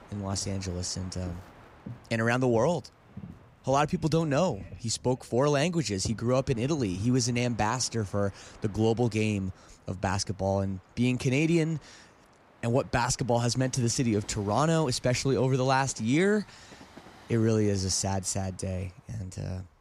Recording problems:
train or aircraft noise; faint; throughout; 20 dB below the speech

